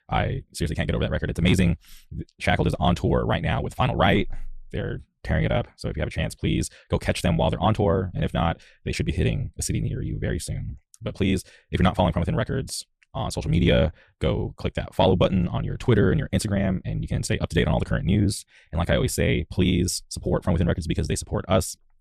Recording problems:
wrong speed, natural pitch; too fast; 1.5 times normal speed

